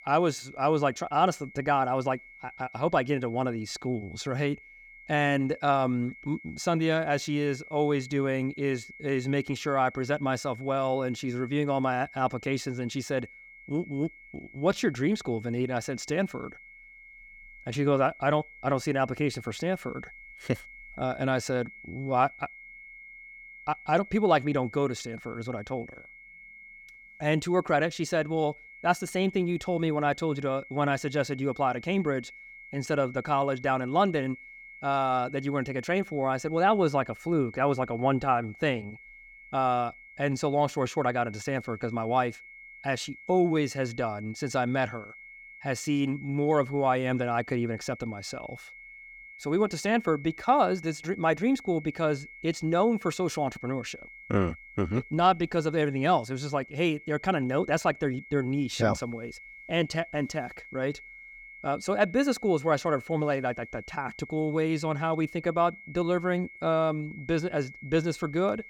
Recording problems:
high-pitched whine; noticeable; throughout; 2 kHz, 20 dB below the speech

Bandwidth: 17 kHz